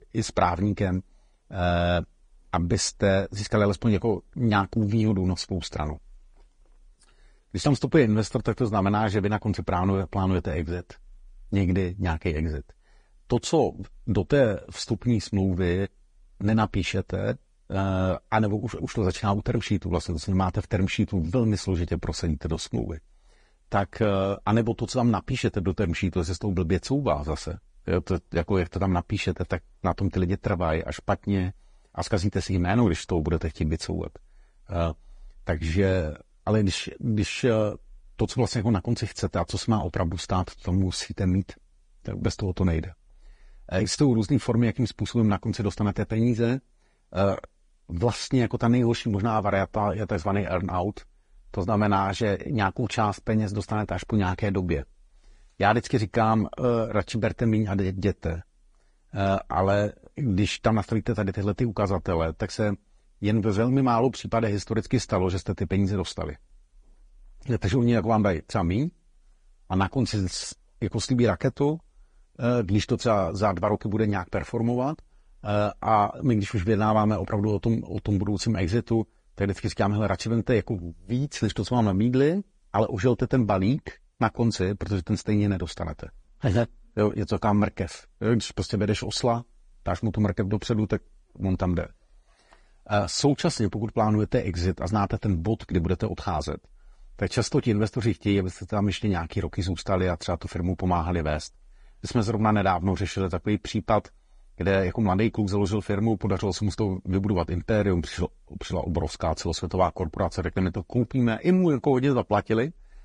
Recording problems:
garbled, watery; slightly; nothing above 8.5 kHz

